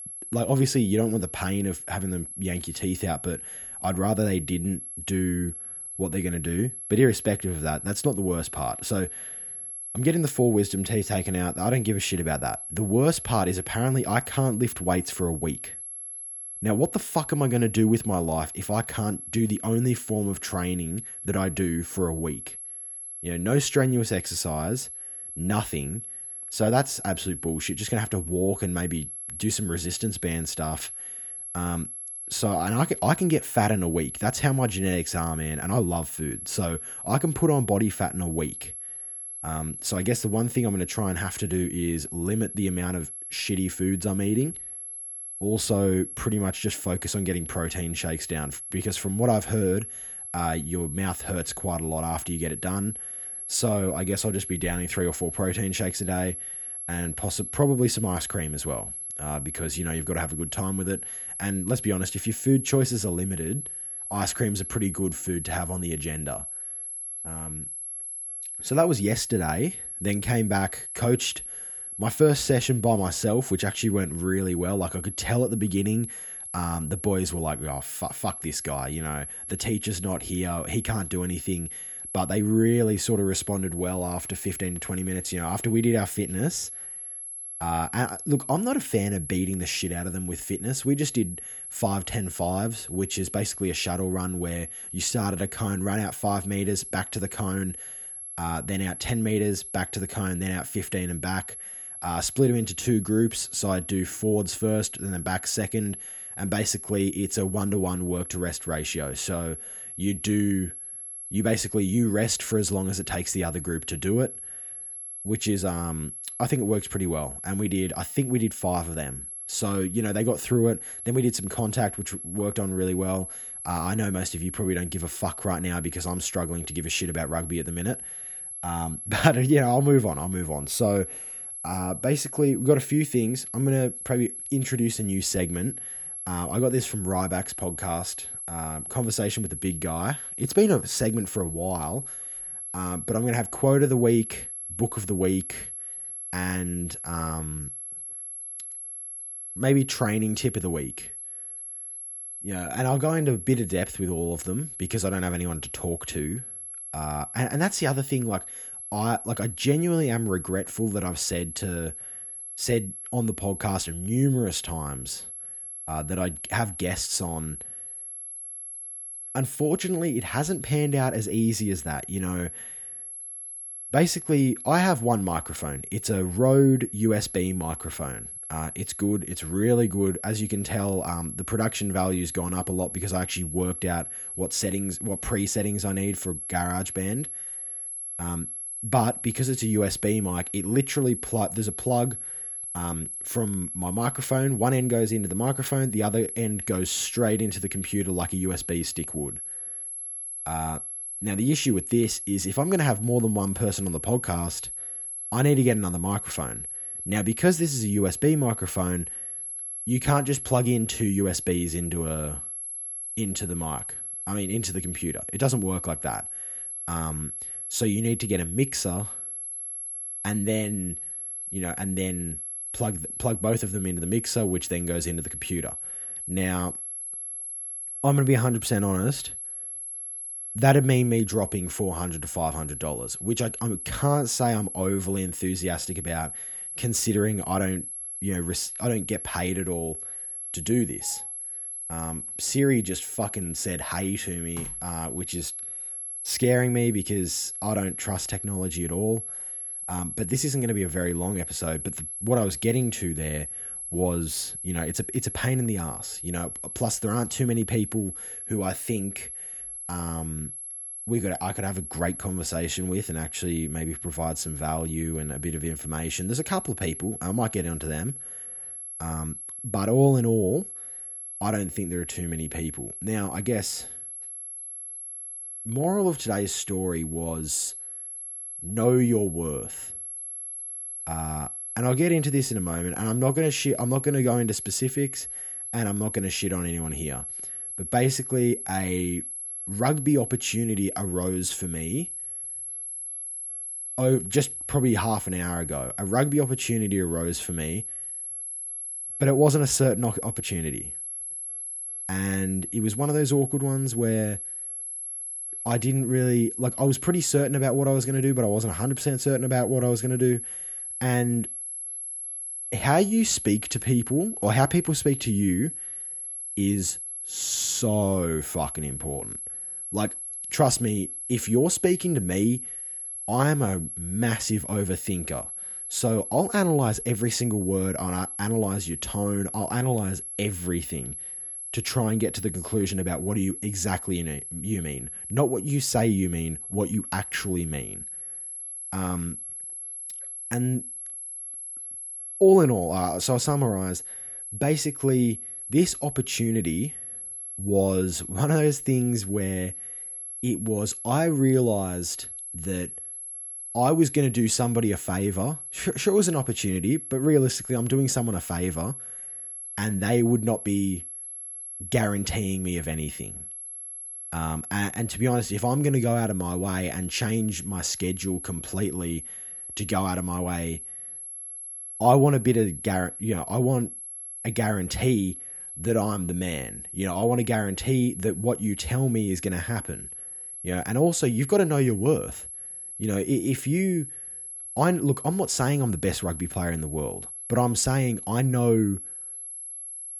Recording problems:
high-pitched whine; loud; throughout; 11 kHz, 7 dB below the speech

